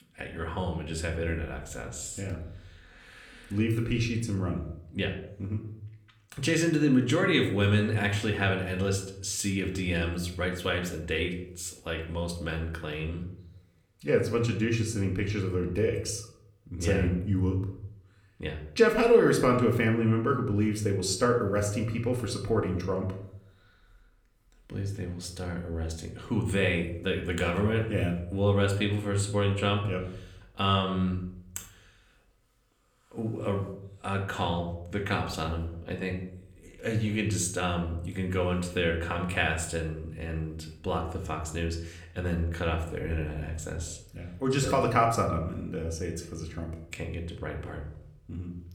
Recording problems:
room echo; slight; dies away in 0.5 s
off-mic speech; somewhat distant

